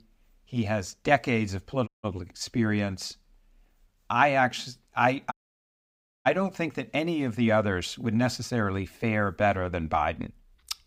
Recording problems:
audio cutting out; at 2 s and at 5.5 s for 1 s

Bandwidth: 15.5 kHz